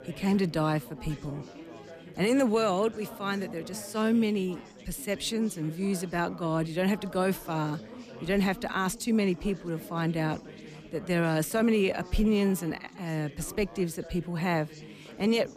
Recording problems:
background chatter; noticeable; throughout; 4 voices, 15 dB below the speech

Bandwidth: 14.5 kHz